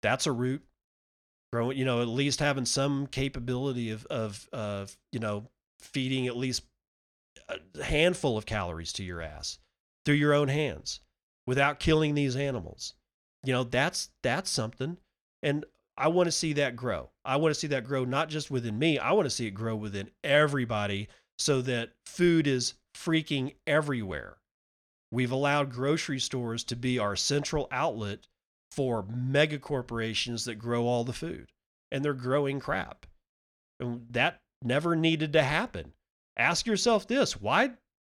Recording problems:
none

